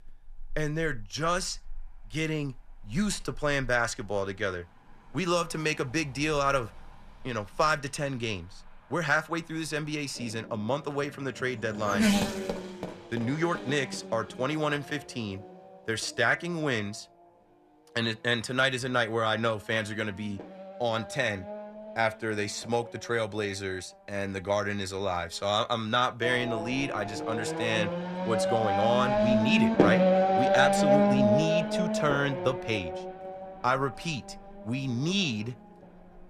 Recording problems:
traffic noise; very loud; throughout; 2 dB above the speech

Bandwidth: 14 kHz